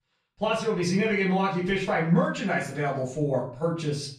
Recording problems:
off-mic speech; far
room echo; slight; dies away in 0.4 s

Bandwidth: 14.5 kHz